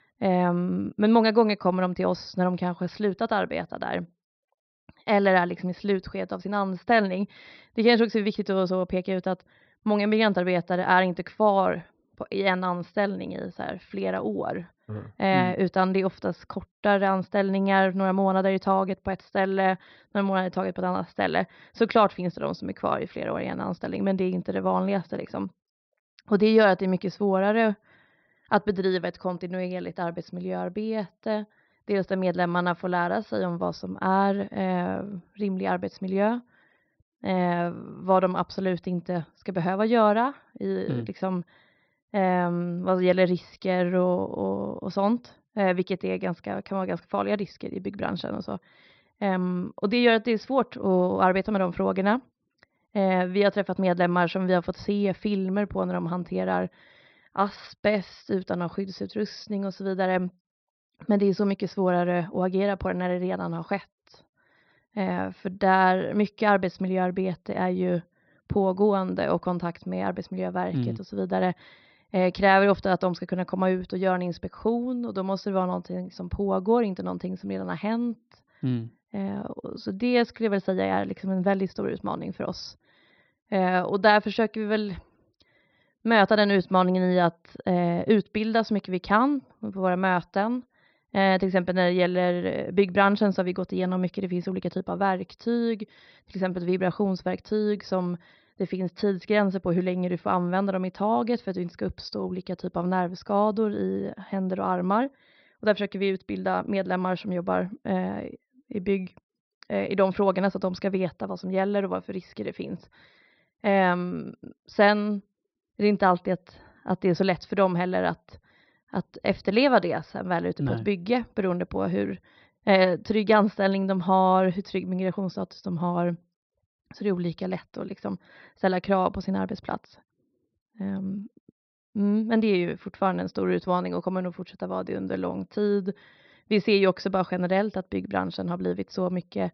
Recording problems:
high frequencies cut off; noticeable; nothing above 5.5 kHz

